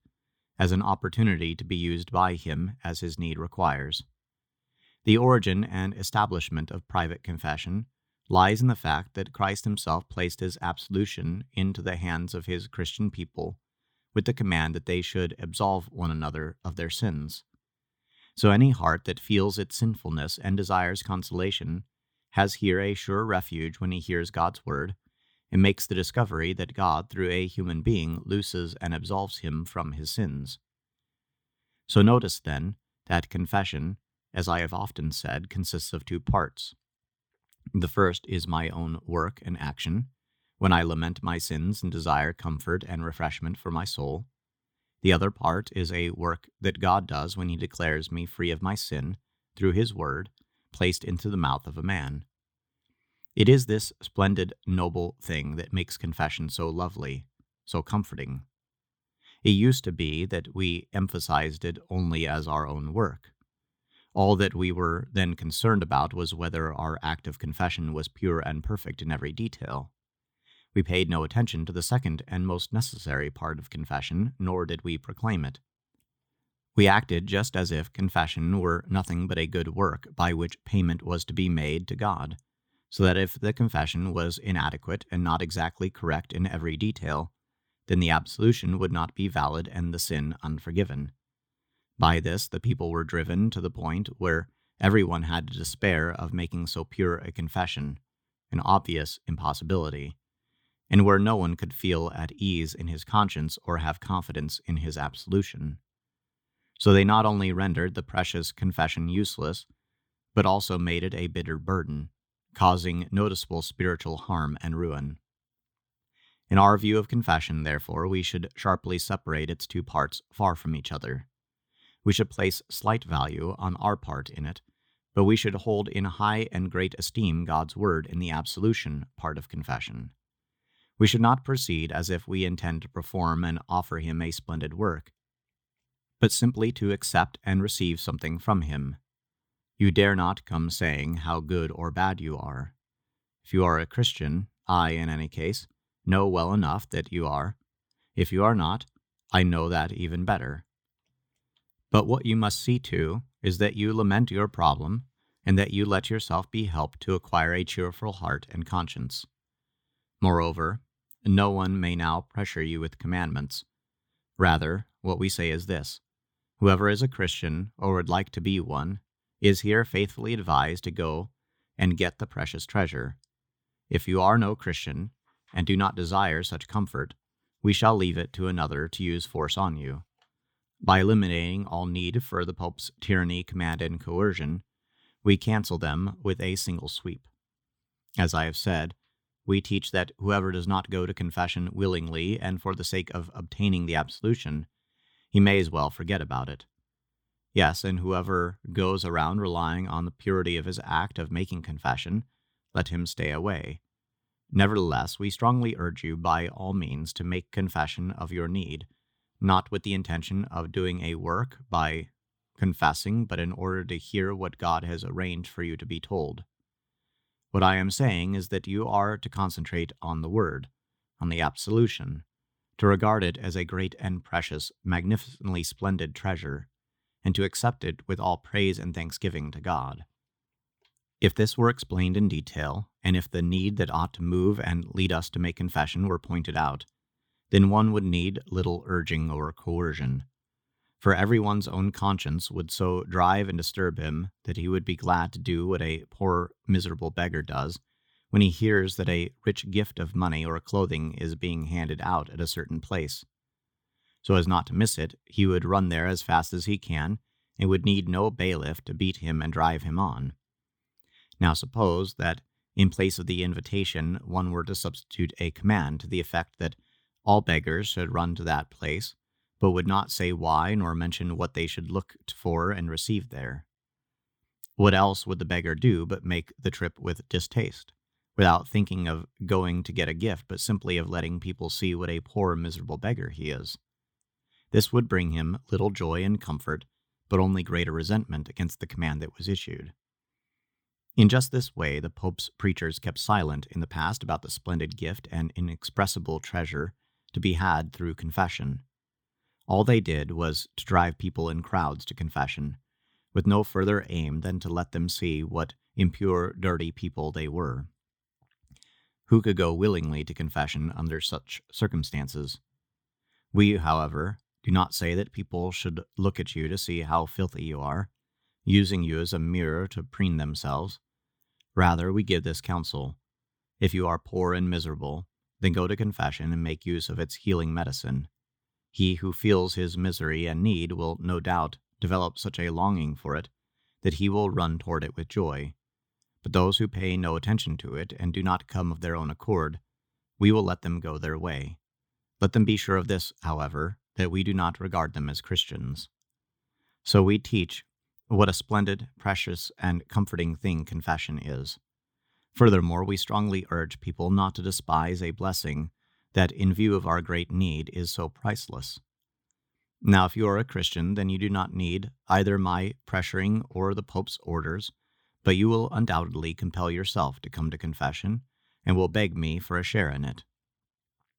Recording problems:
none

